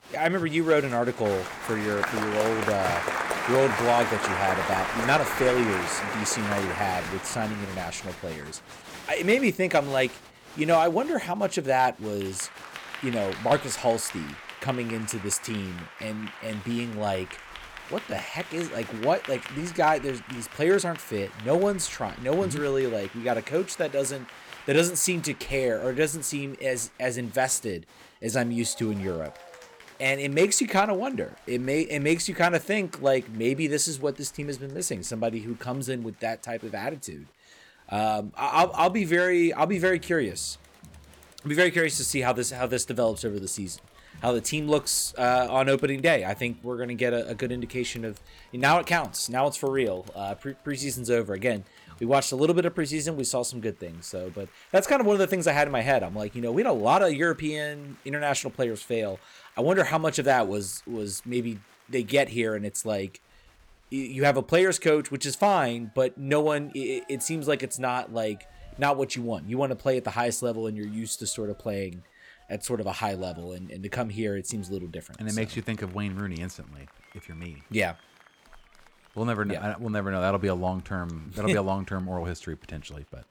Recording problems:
crowd noise; loud; throughout; 8 dB below the speech

